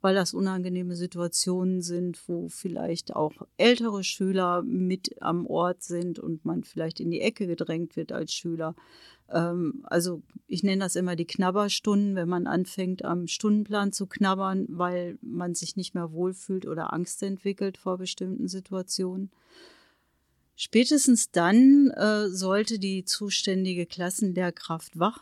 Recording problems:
none

